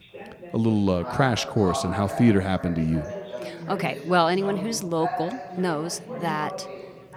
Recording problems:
background chatter; loud; throughout; 4 voices, 10 dB below the speech

